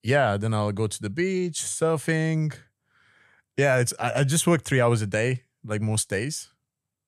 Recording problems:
none

